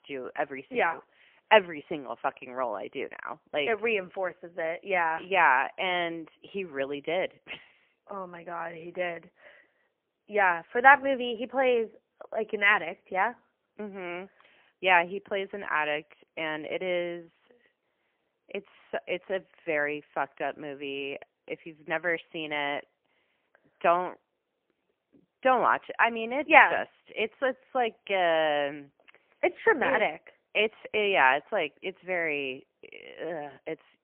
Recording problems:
phone-call audio; poor line; nothing above 3 kHz

